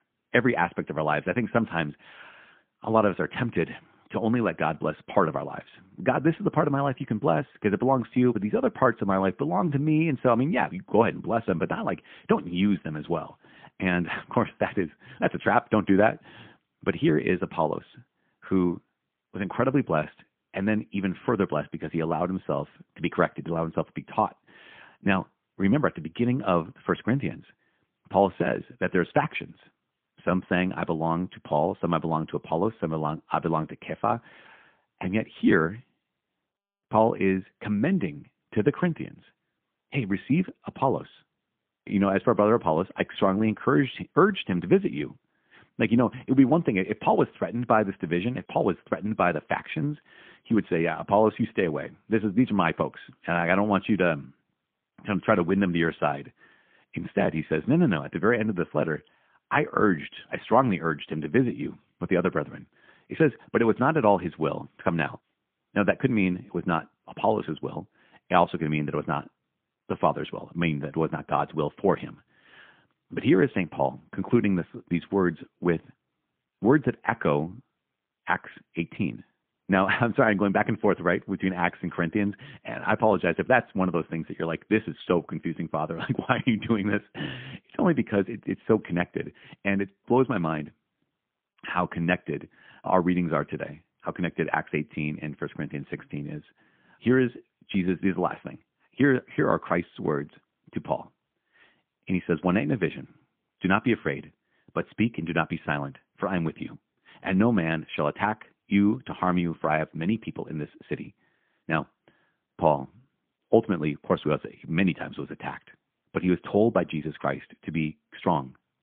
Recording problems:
phone-call audio; poor line; nothing above 3.5 kHz

